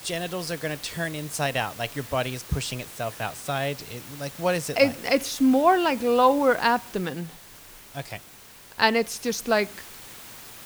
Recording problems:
hiss; noticeable; throughout; 15 dB below the speech

